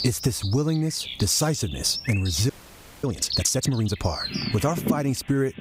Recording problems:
squashed, flat; somewhat, background pumping
animal sounds; loud; throughout; 7 dB below the speech
audio freezing; at 2.5 s for 0.5 s

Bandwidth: 15.5 kHz